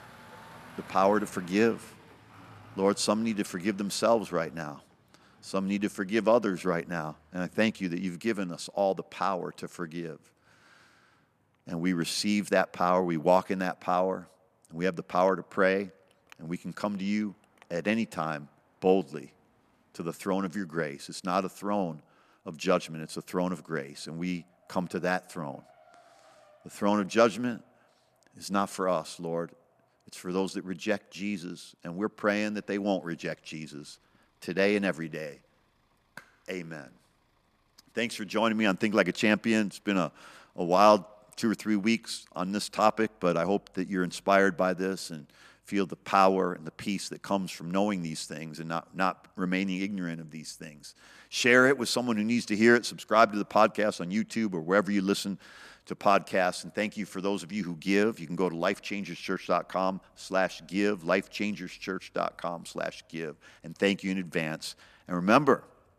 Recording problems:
traffic noise; faint; throughout; 30 dB below the speech

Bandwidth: 14.5 kHz